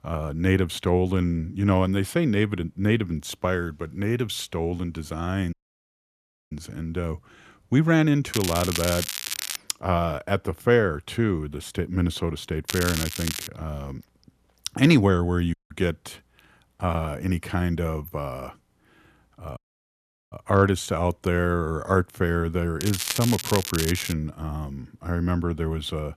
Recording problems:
crackling; loud; from 8.5 to 9.5 s, at 13 s and from 23 to 24 s; 5 dB below the speech
audio cutting out; at 5.5 s for 1 s, at 16 s and at 20 s for 1 s

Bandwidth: 14.5 kHz